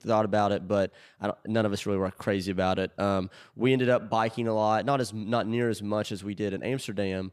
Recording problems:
none

